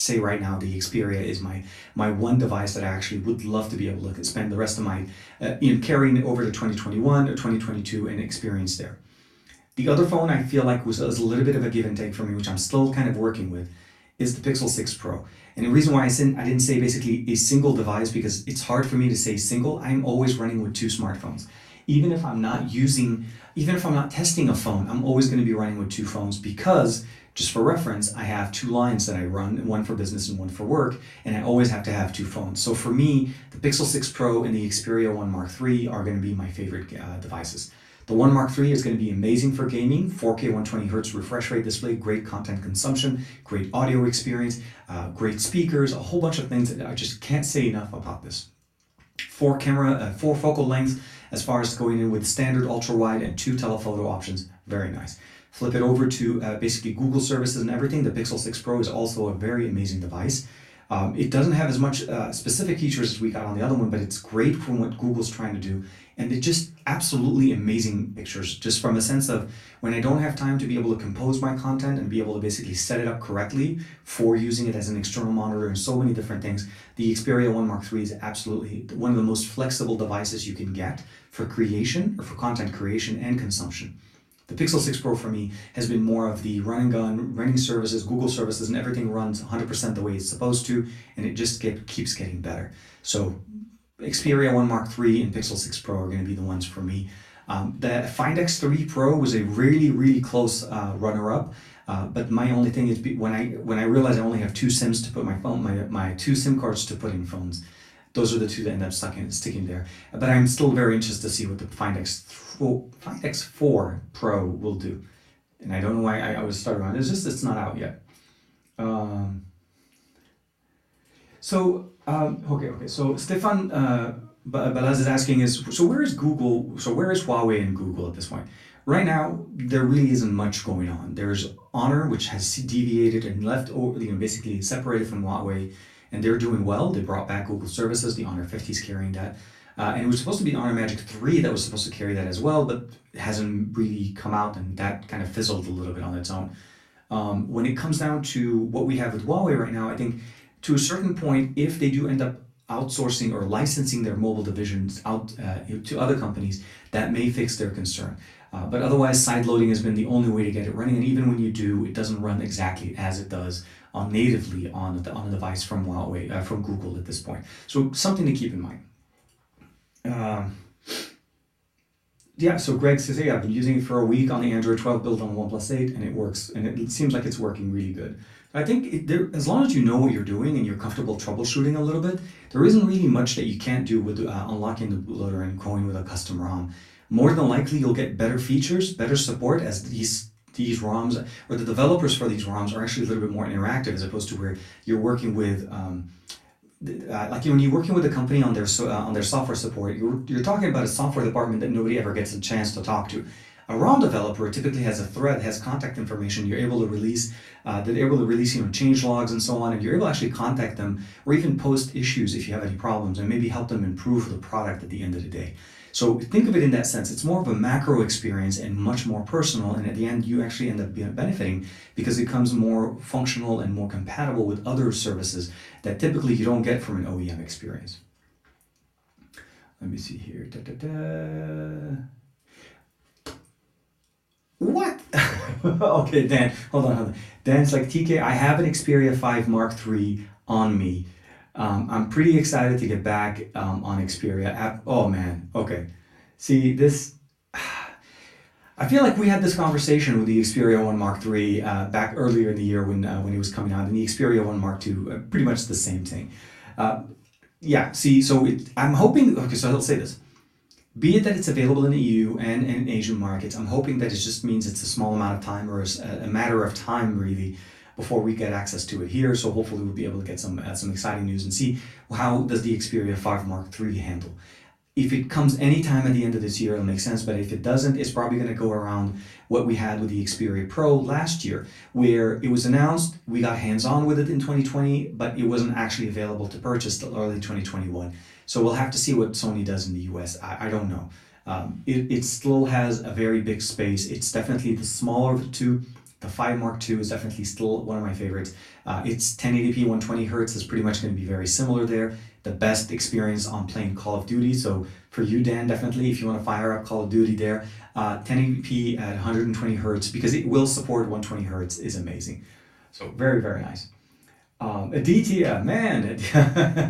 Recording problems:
off-mic speech; far
room echo; very slight; dies away in 0.3 s
abrupt cut into speech; at the start

